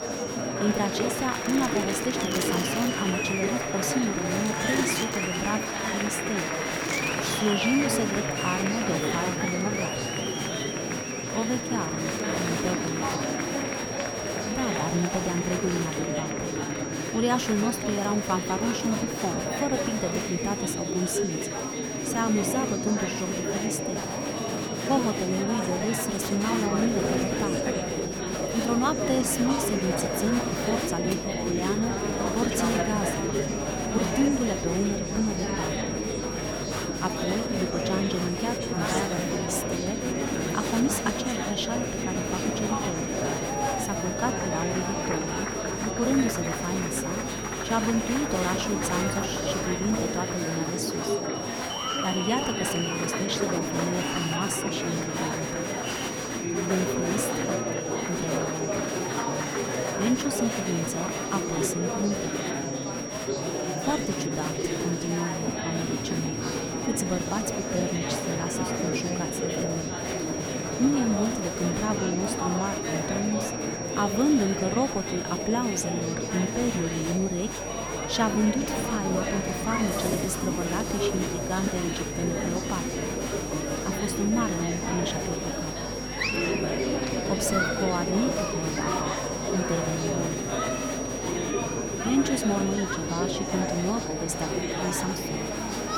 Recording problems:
murmuring crowd; very loud; throughout; as loud as the speech
high-pitched whine; loud; throughout; 5.5 kHz, 7 dB below the speech
electrical hum; noticeable; from 27 to 50 s and from 1:17 on; 50 Hz, 20 dB below the speech
household noises; noticeable; throughout; 15 dB below the speech

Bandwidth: 18 kHz